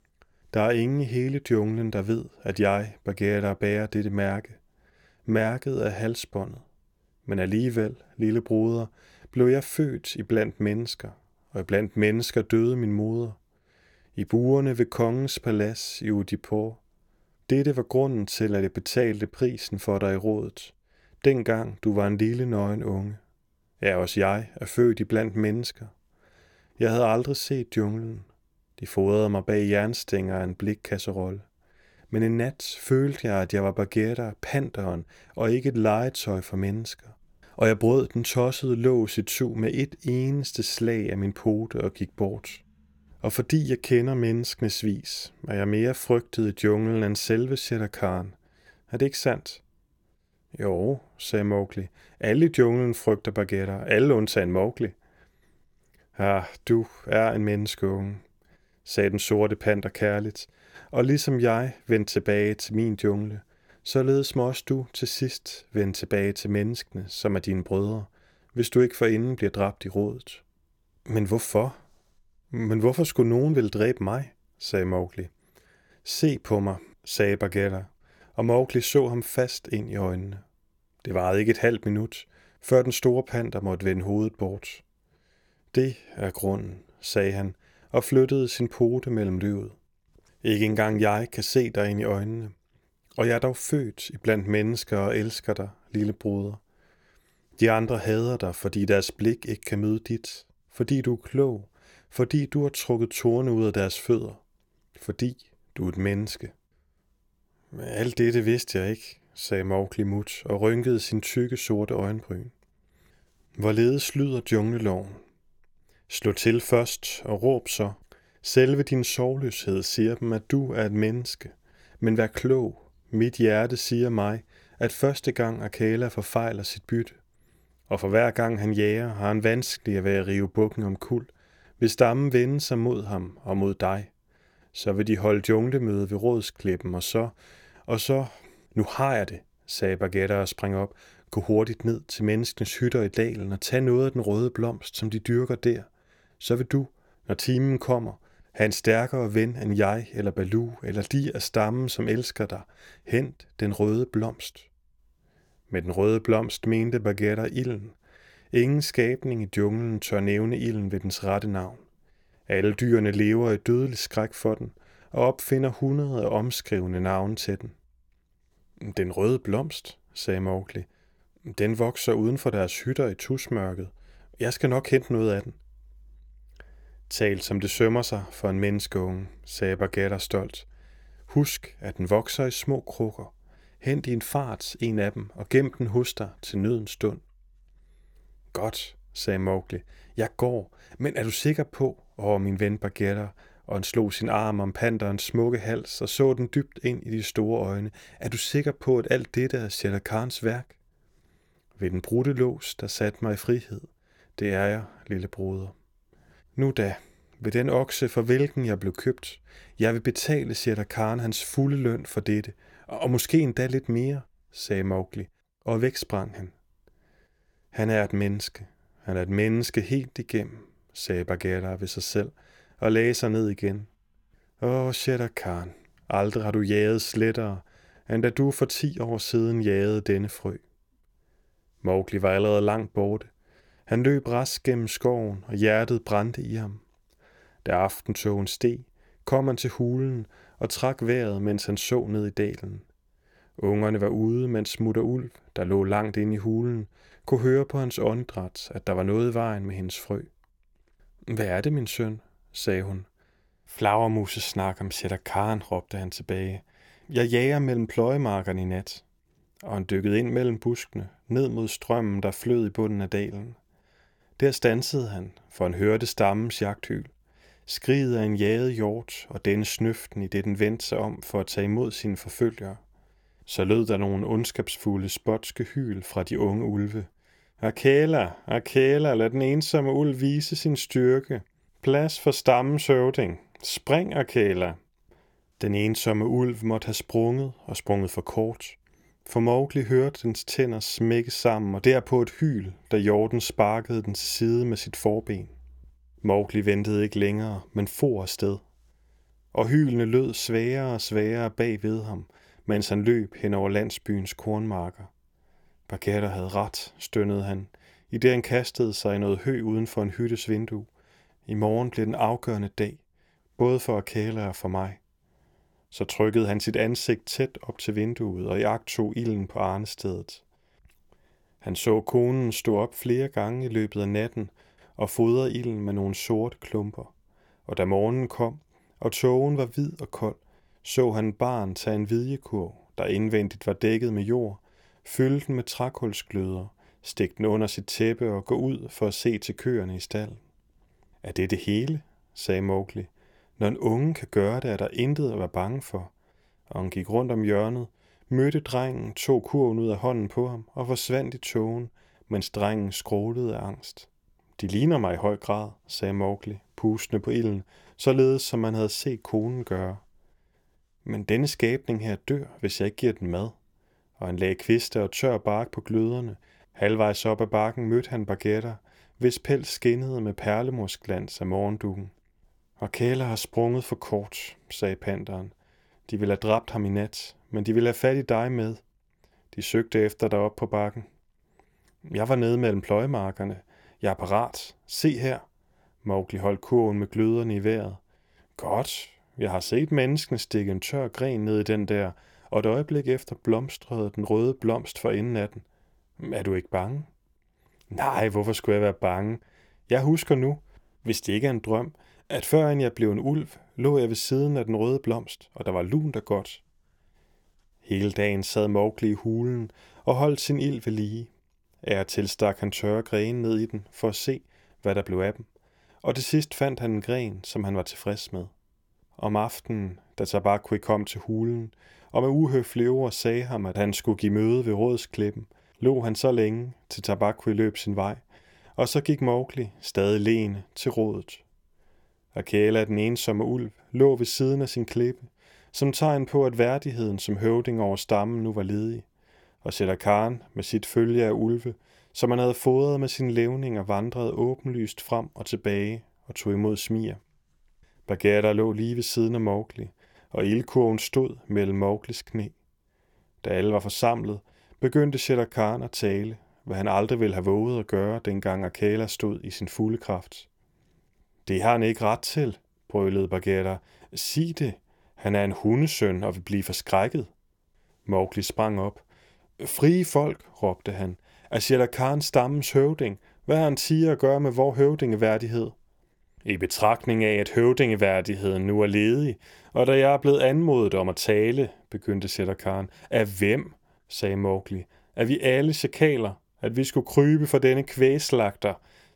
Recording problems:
none

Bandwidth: 18 kHz